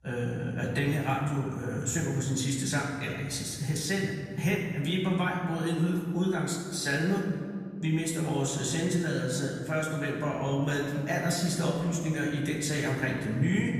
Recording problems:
off-mic speech; far
room echo; noticeable; dies away in 1.8 s

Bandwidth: 14.5 kHz